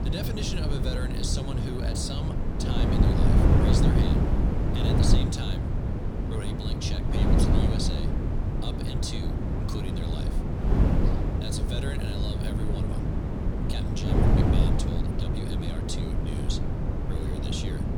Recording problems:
wind noise on the microphone; heavy; 3 dB above the speech

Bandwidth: 19 kHz